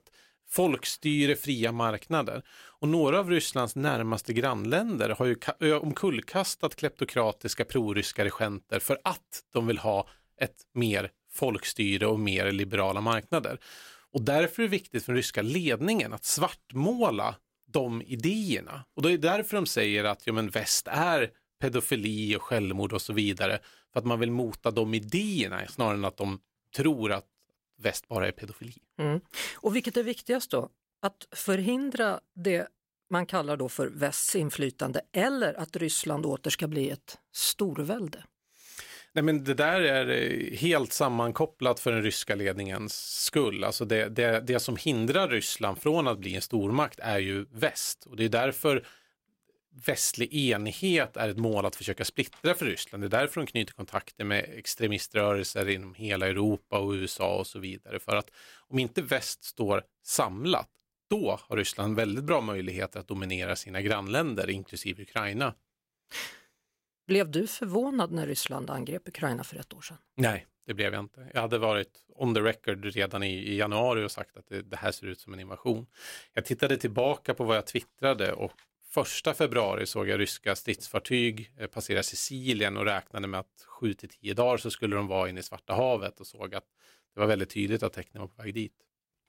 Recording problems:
none

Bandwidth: 16 kHz